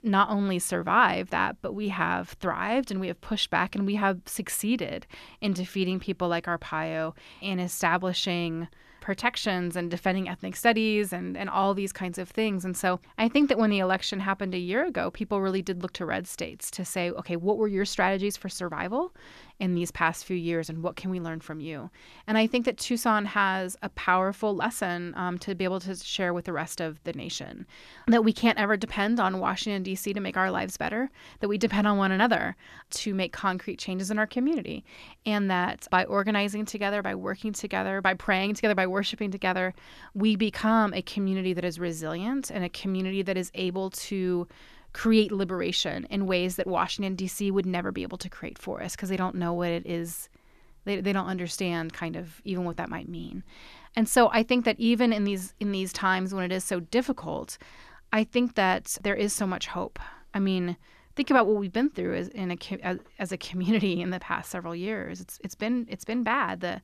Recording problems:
none

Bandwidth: 14 kHz